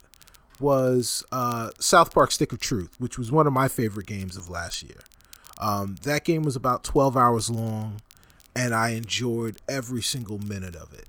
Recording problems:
crackle, like an old record; faint; 30 dB below the speech

